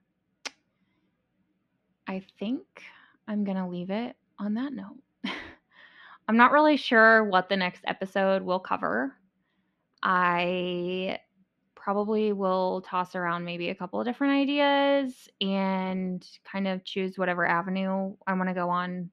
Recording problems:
muffled; very slightly; fading above 3 kHz

